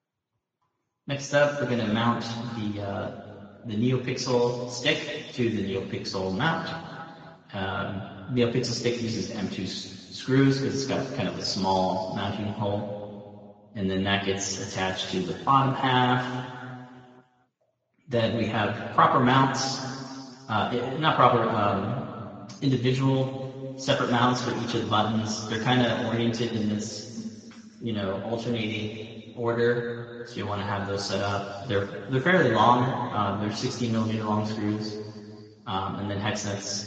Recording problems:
room echo; noticeable; dies away in 2.3 s
off-mic speech; somewhat distant
garbled, watery; slightly

